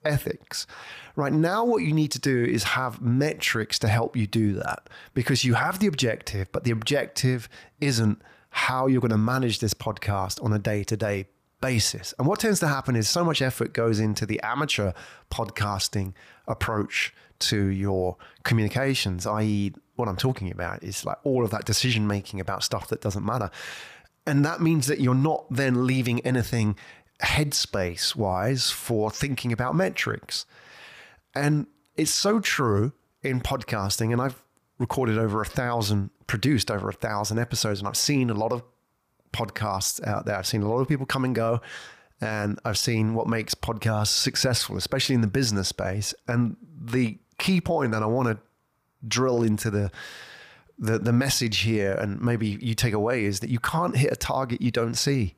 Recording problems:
none

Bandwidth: 15 kHz